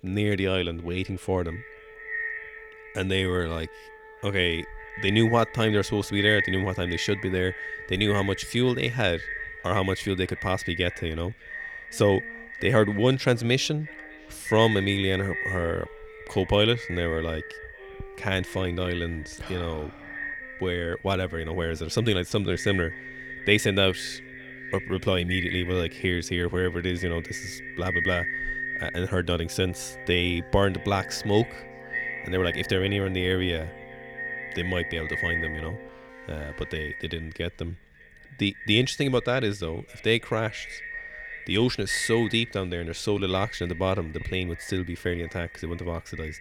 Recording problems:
echo of what is said; strong; throughout; 600 ms later, 8 dB below the speech
background music; faint; throughout; 20 dB below the speech

